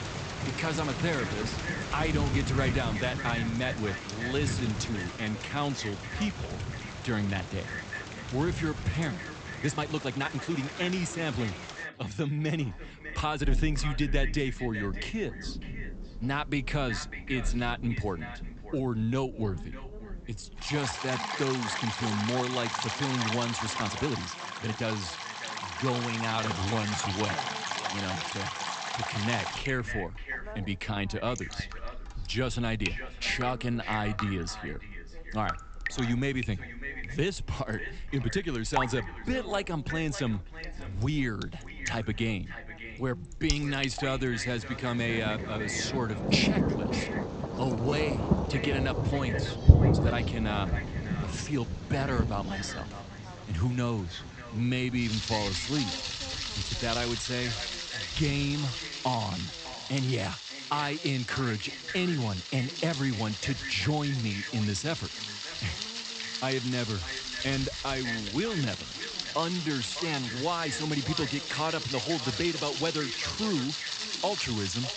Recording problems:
echo of what is said; strong; throughout; 600 ms later, 10 dB below the speech
high frequencies cut off; noticeable; nothing above 8 kHz
rain or running water; loud; throughout; 2 dB below the speech
voice in the background; faint; throughout; 20 dB below the speech
uneven, jittery; strongly; from 5 s to 1:12

